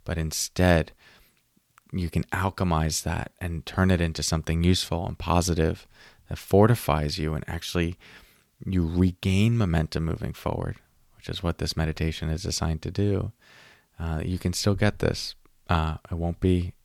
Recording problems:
none

